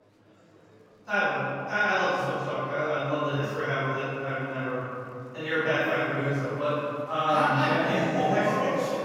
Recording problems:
room echo; strong; dies away in 2.6 s
off-mic speech; far
echo of what is said; faint; throughout; 90 ms later, 20 dB below the speech
murmuring crowd; faint; throughout; 30 dB below the speech

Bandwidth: 16.5 kHz